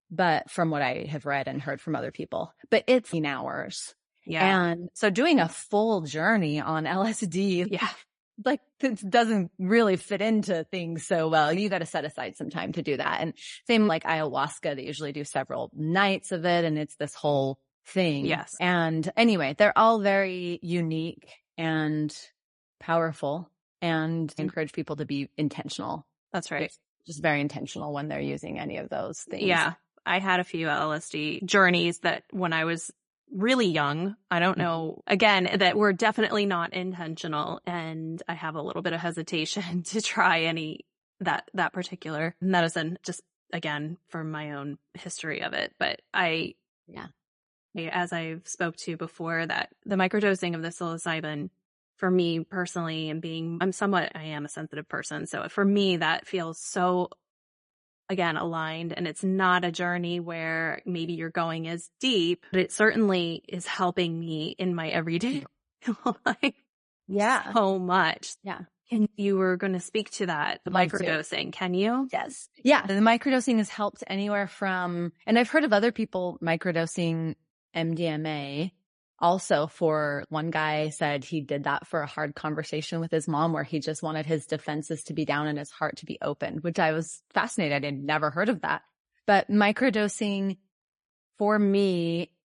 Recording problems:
garbled, watery; slightly; nothing above 10.5 kHz

